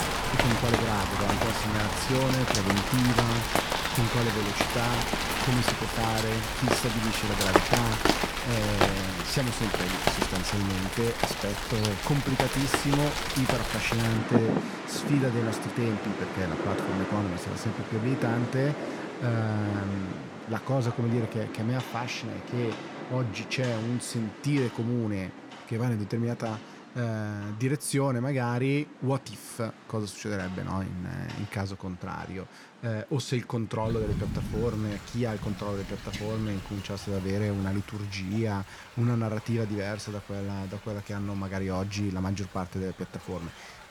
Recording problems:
rain or running water; very loud; throughout; as loud as the speech

